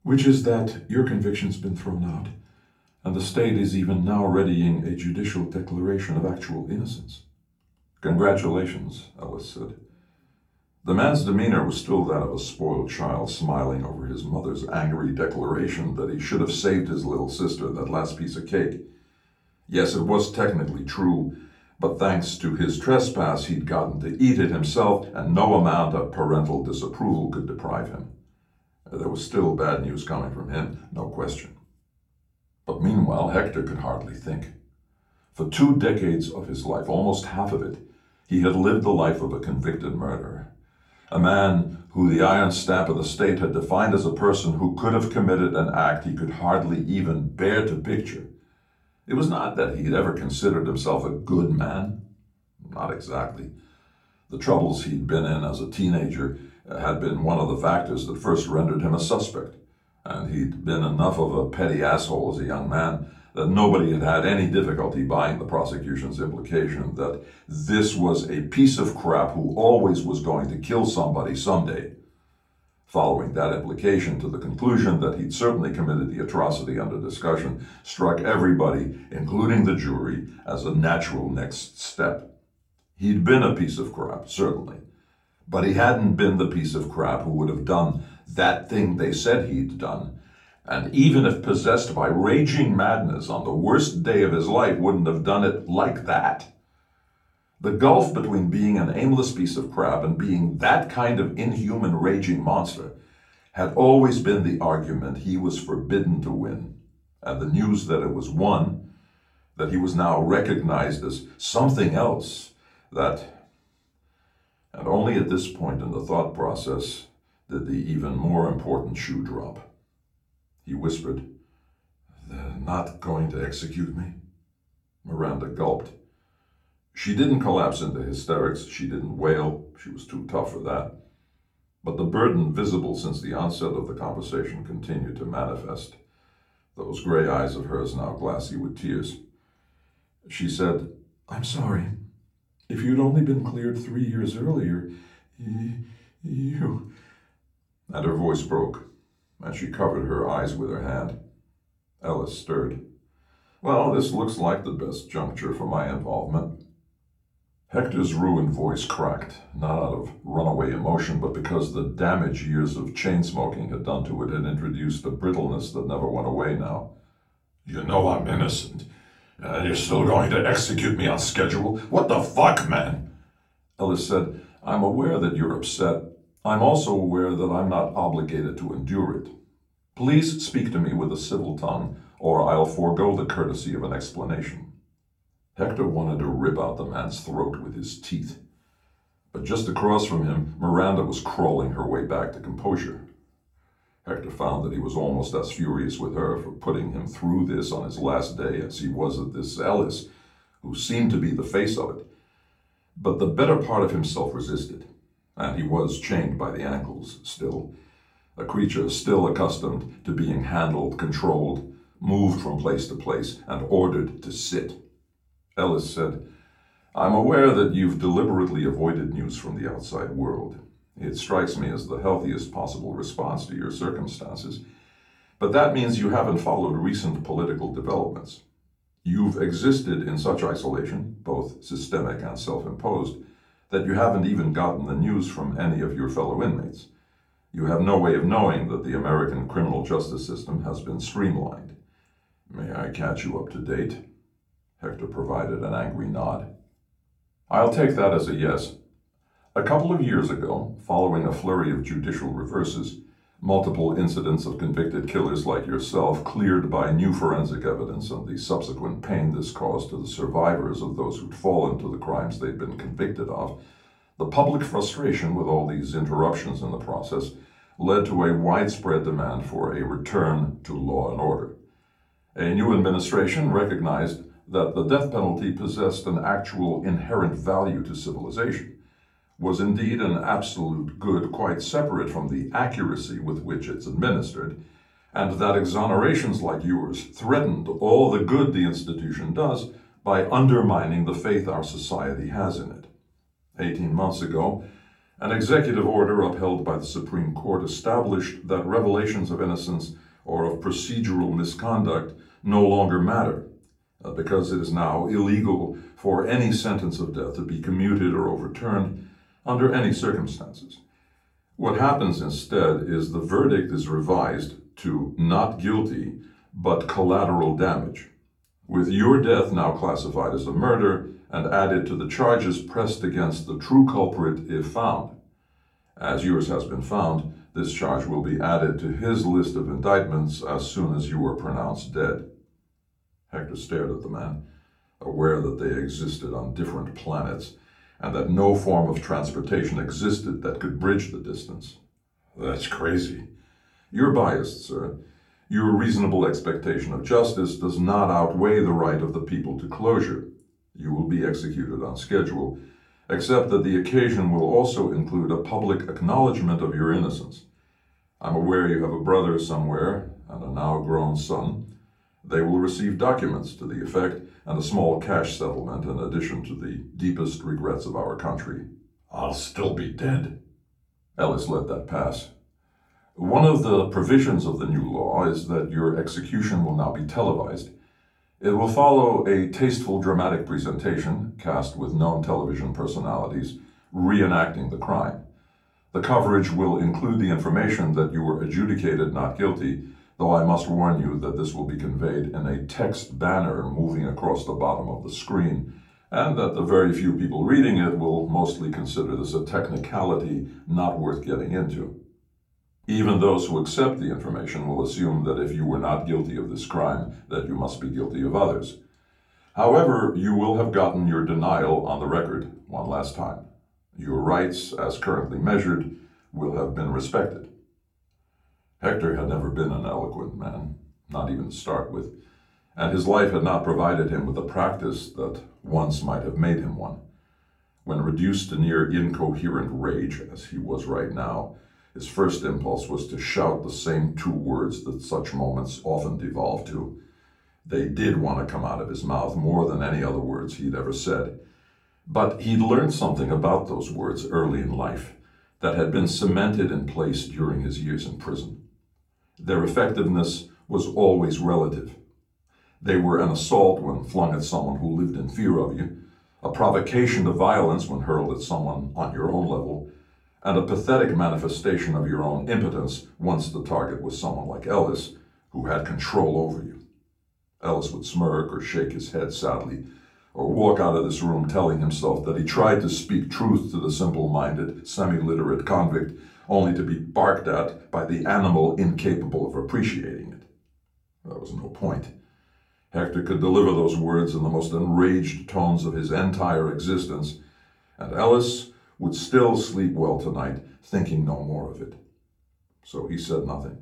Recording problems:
off-mic speech; far
room echo; very slight; dies away in 0.3 s

